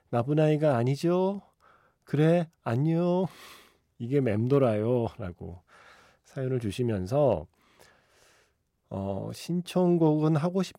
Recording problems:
none

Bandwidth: 16 kHz